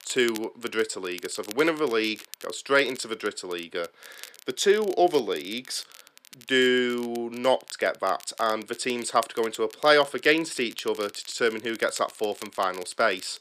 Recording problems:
thin; very slightly; fading below 350 Hz
crackle, like an old record; noticeable; 20 dB below the speech

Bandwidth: 14.5 kHz